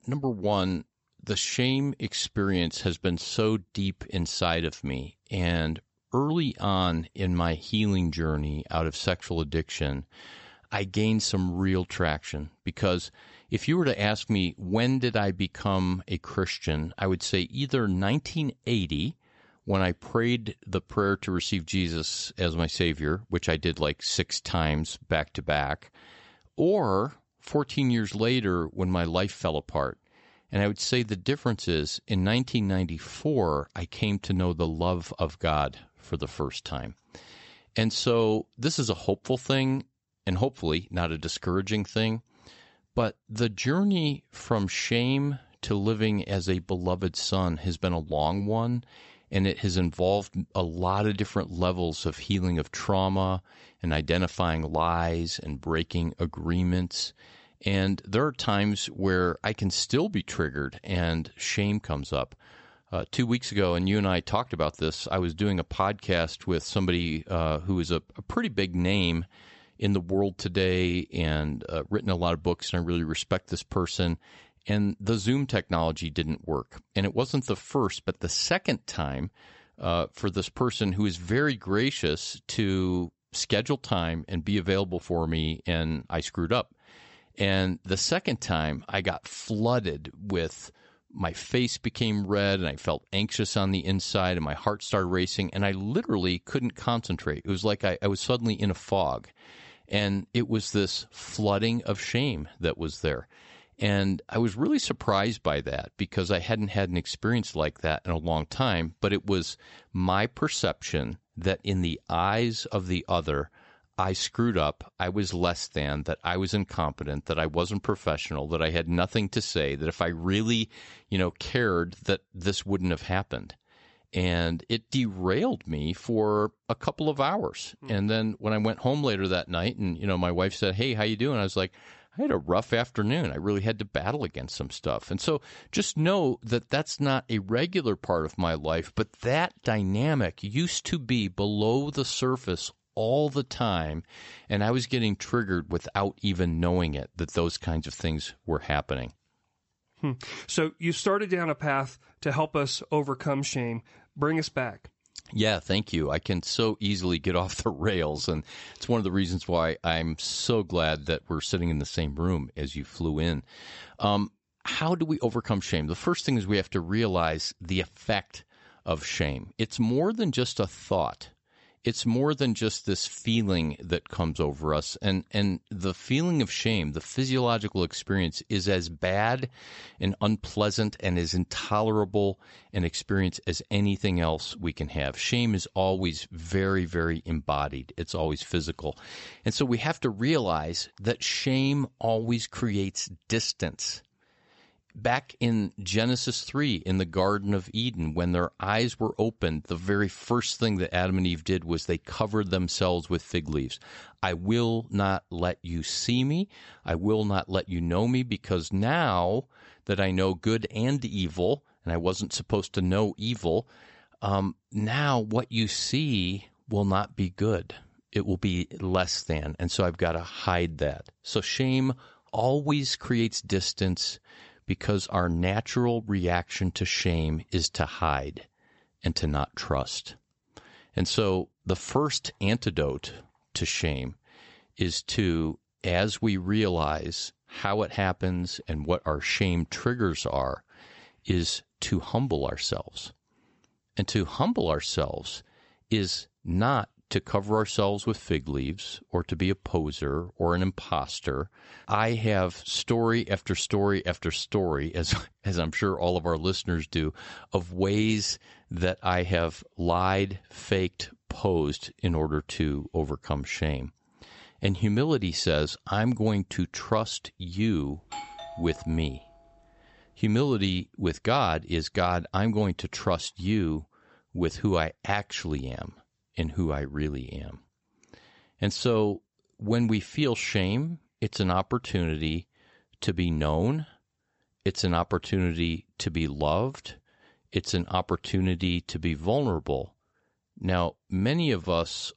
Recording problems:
high frequencies cut off; noticeable; nothing above 8 kHz
doorbell; faint; from 4:28 to 4:29; peak 10 dB below the speech

